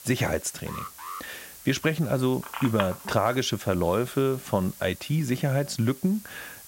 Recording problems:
hiss; noticeable; throughout; 15 dB below the speech
alarm; faint; at 0.5 s; peak 10 dB below the speech
phone ringing; noticeable; at 2.5 s; peak 6 dB below the speech

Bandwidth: 16 kHz